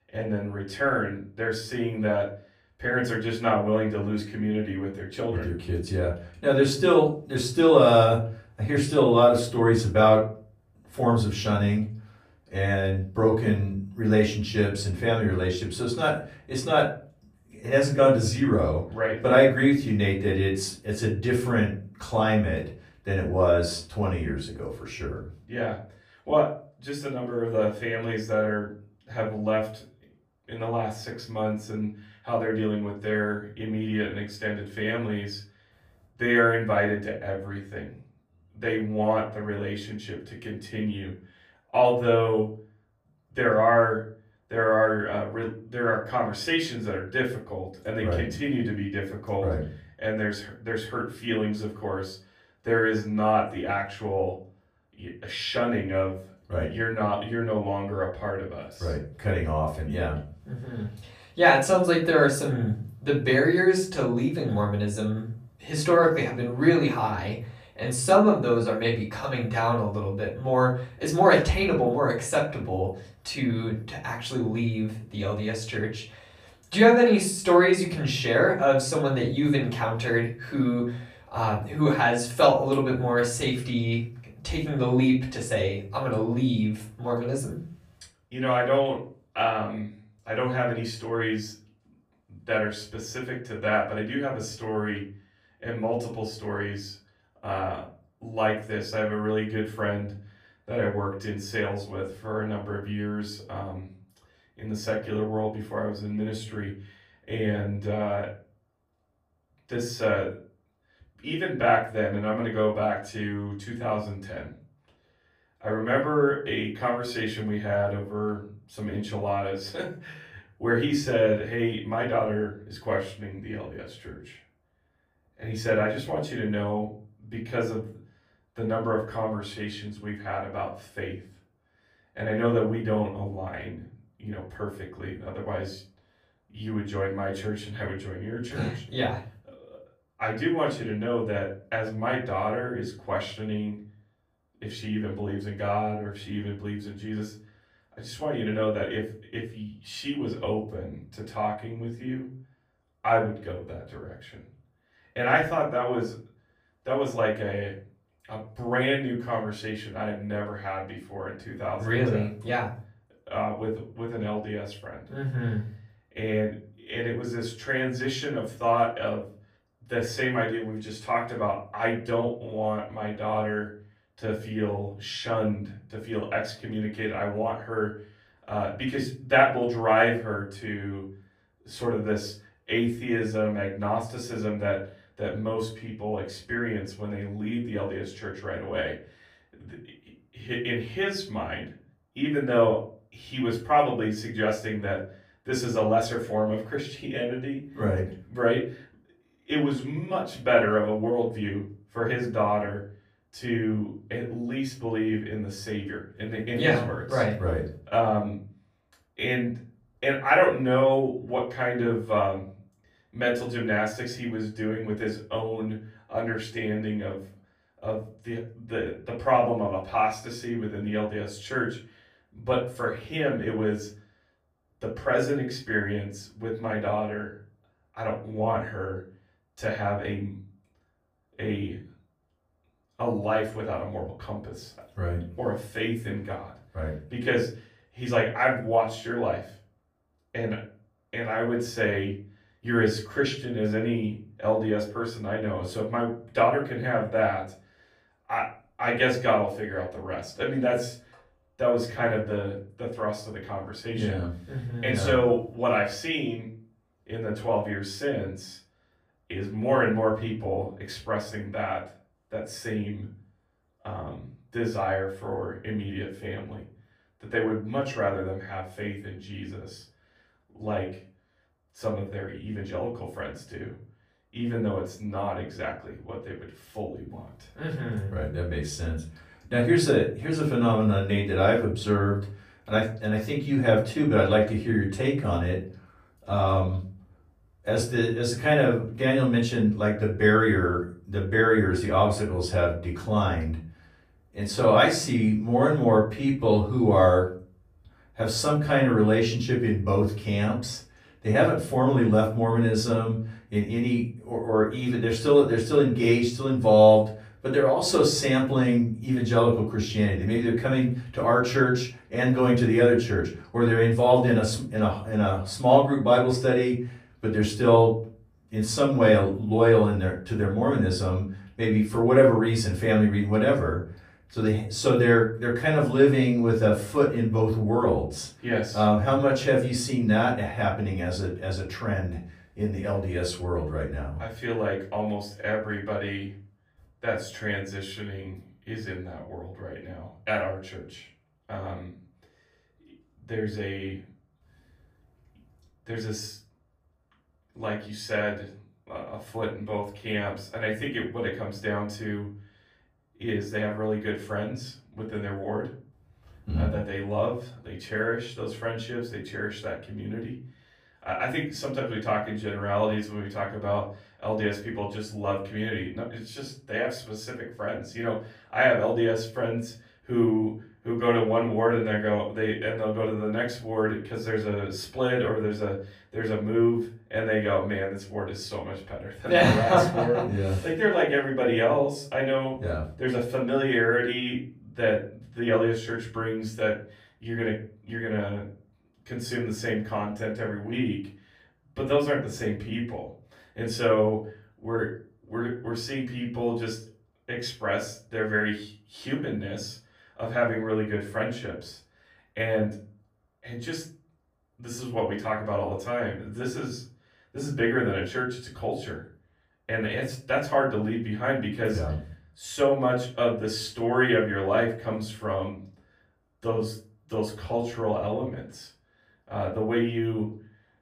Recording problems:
off-mic speech; far
room echo; slight; dies away in 0.3 s

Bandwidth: 15 kHz